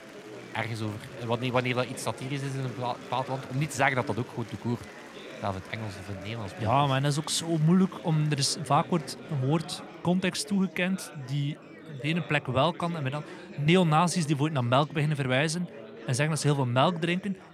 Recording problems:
chatter from many people; noticeable; throughout; 15 dB below the speech

